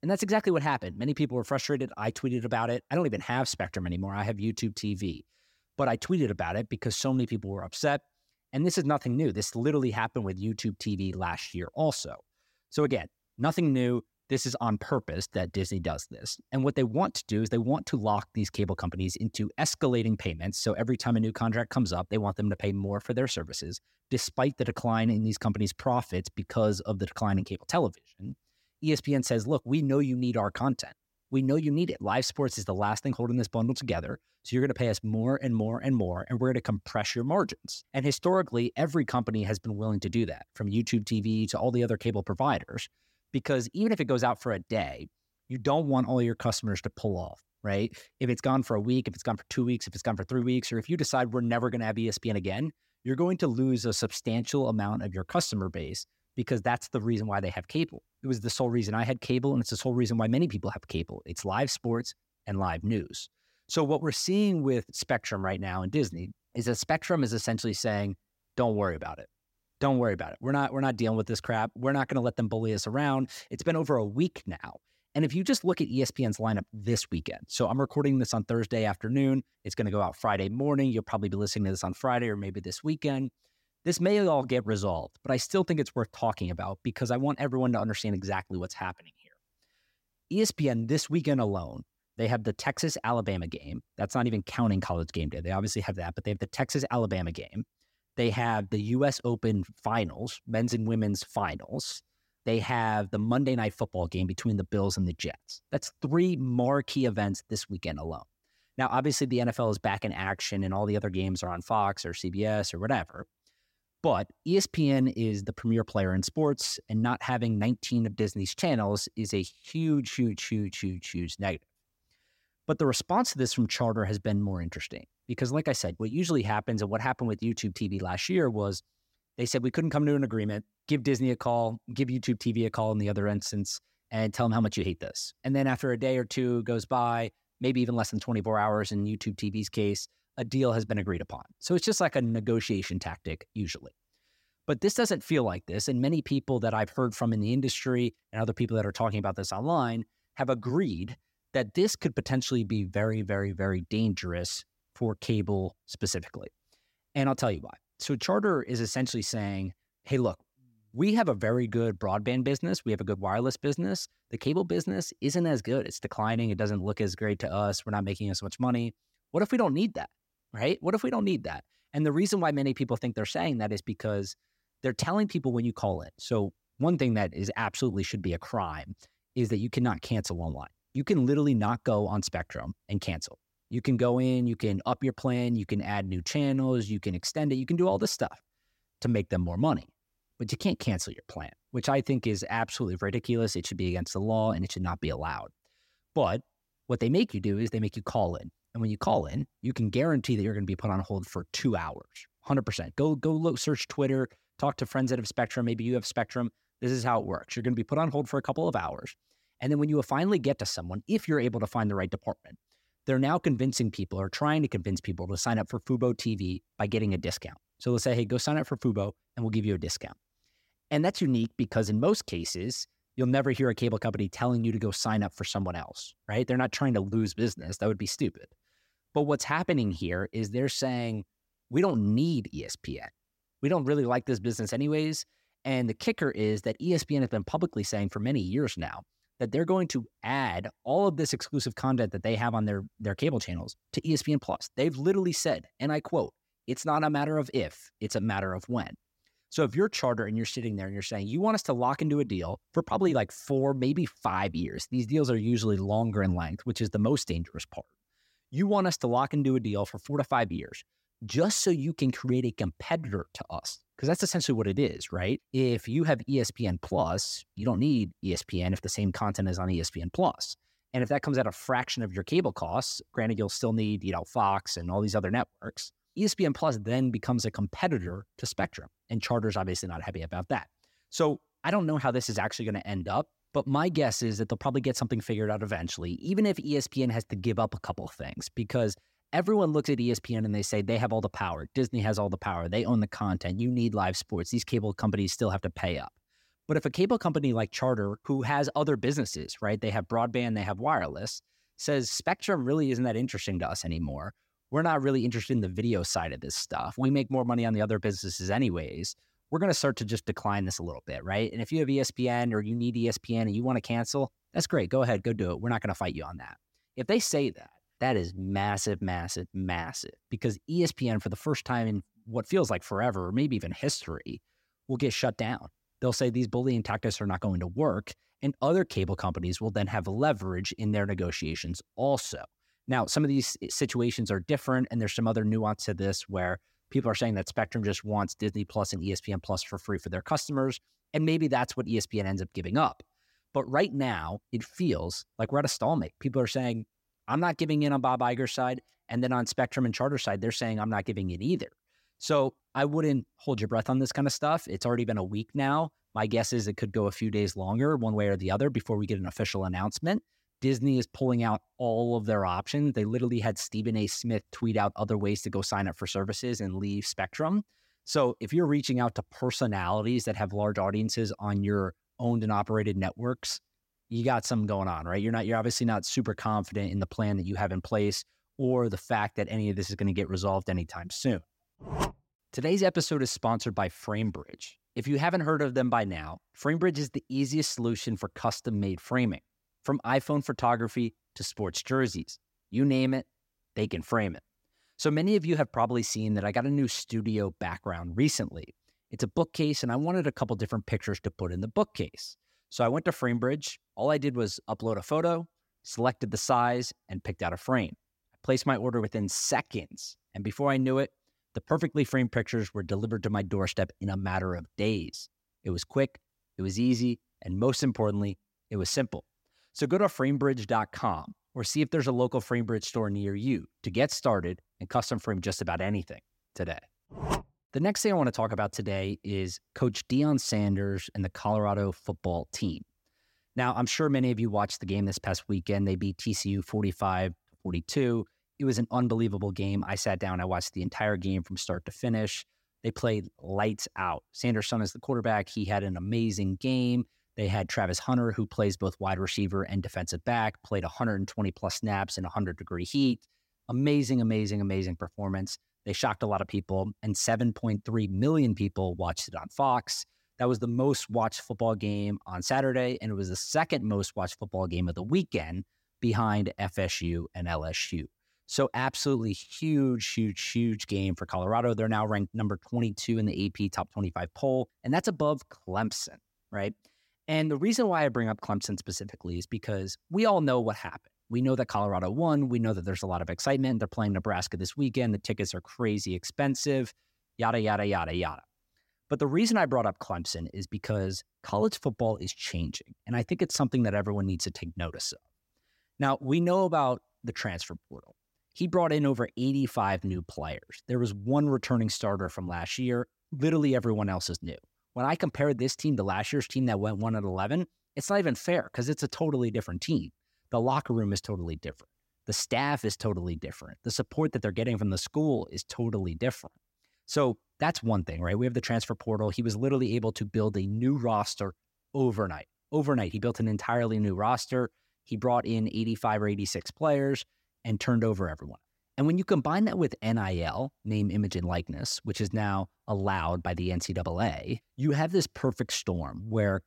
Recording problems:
none

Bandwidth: 16 kHz